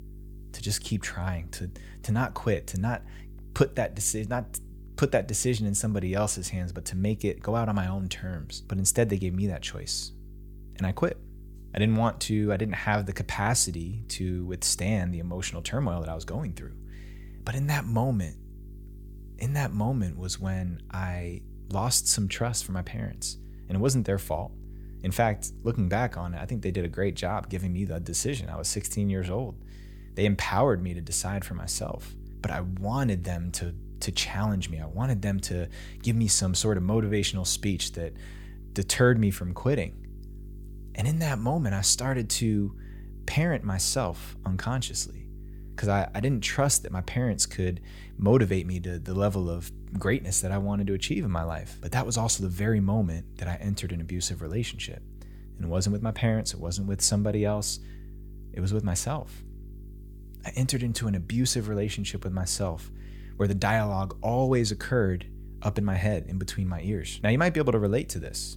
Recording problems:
electrical hum; faint; throughout; 50 Hz, 25 dB below the speech

